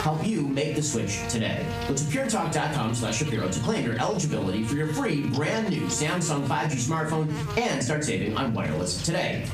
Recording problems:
off-mic speech; far
room echo; slight; dies away in 0.3 s
squashed, flat; somewhat
electrical hum; noticeable; throughout; 50 Hz, 10 dB below the speech

